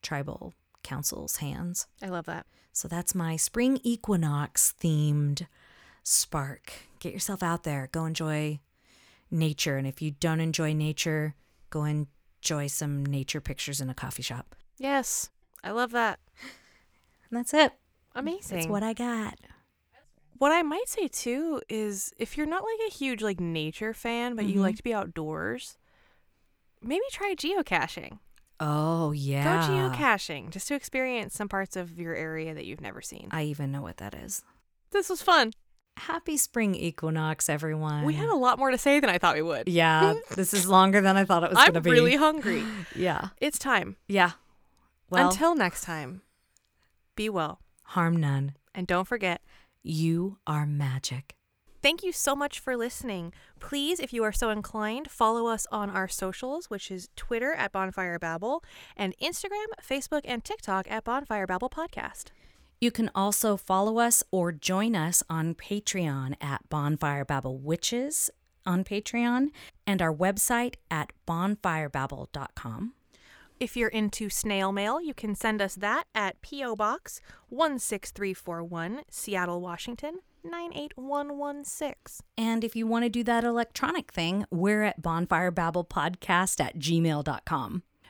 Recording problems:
none

